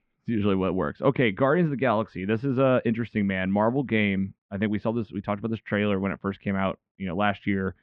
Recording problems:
muffled; very; fading above 2.5 kHz

